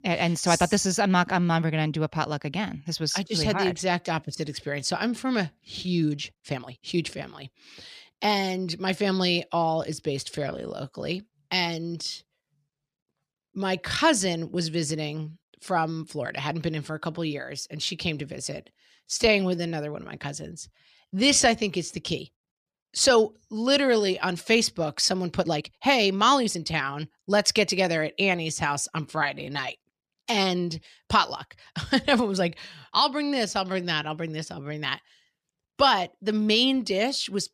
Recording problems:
uneven, jittery; strongly; from 5.5 to 35 s

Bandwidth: 14.5 kHz